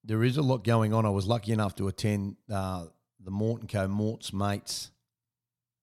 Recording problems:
none

